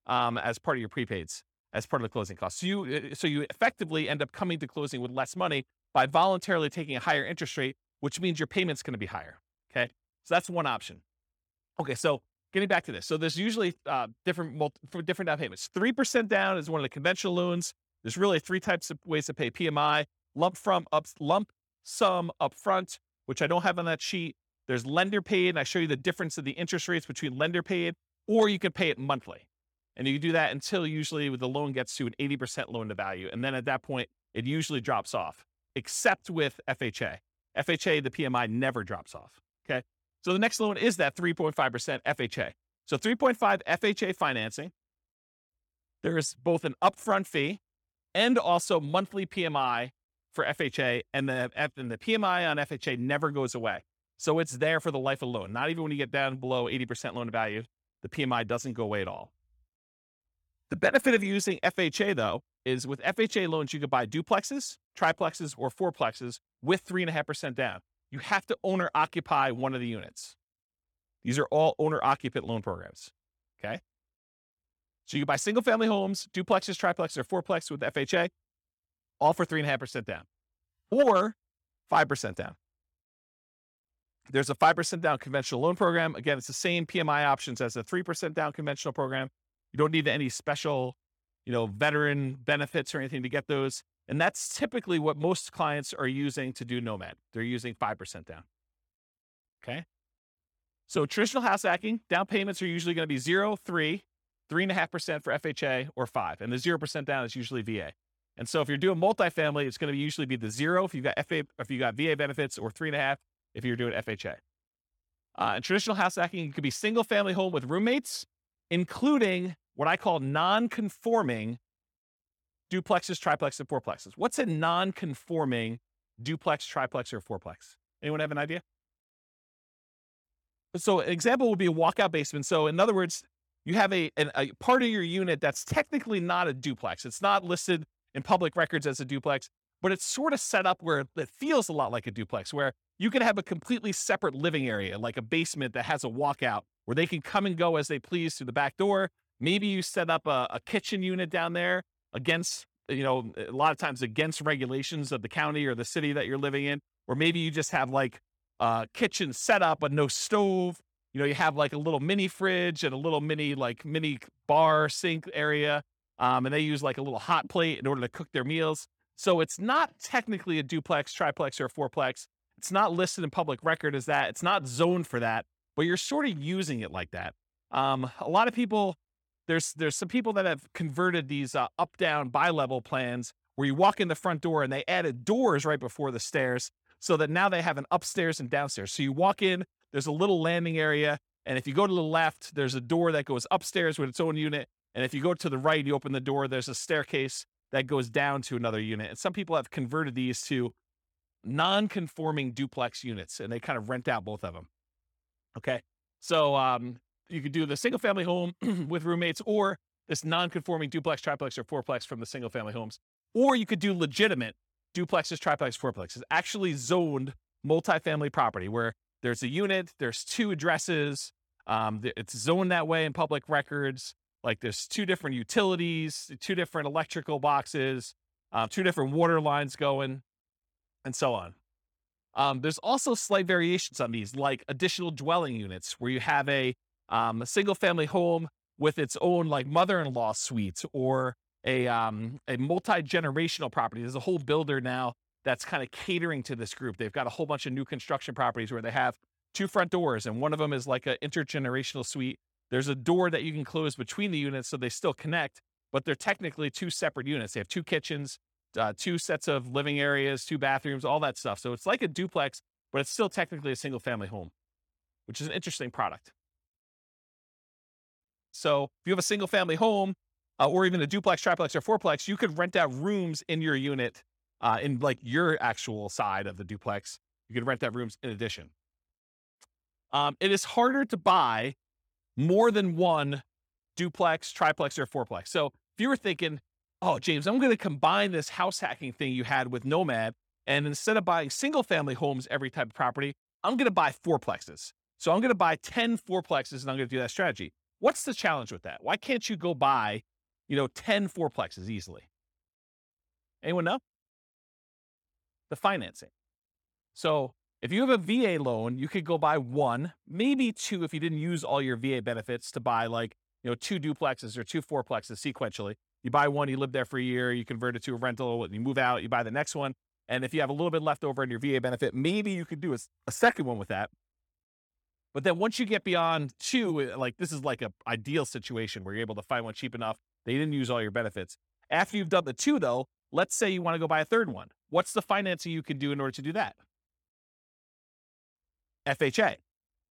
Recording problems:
none

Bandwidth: 18 kHz